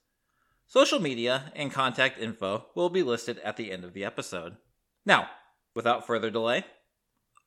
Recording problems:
none

